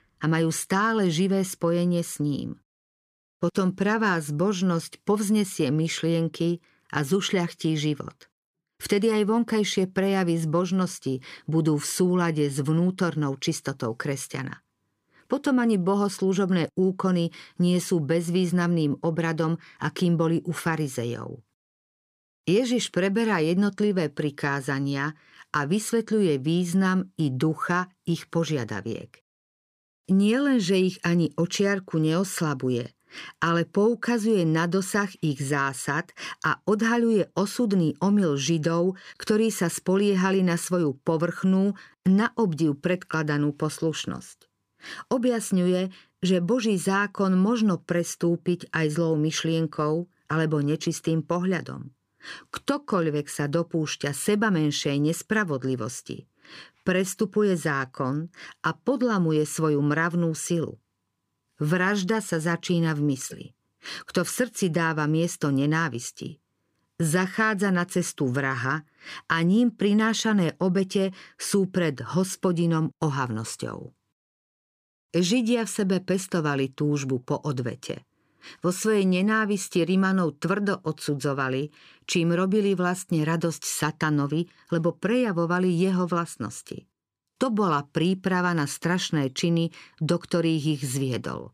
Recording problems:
none

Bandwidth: 15 kHz